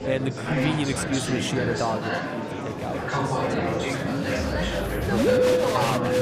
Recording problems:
background music; very loud; throughout; 4 dB above the speech
murmuring crowd; very loud; throughout; 3 dB above the speech

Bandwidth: 14.5 kHz